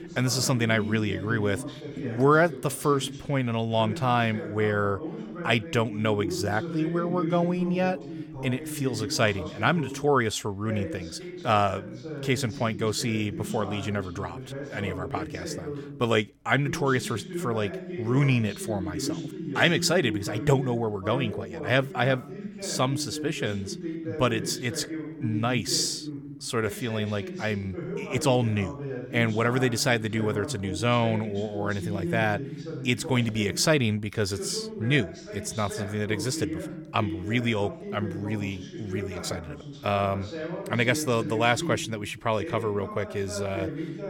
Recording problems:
voice in the background; loud; throughout; 9 dB below the speech

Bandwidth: 17.5 kHz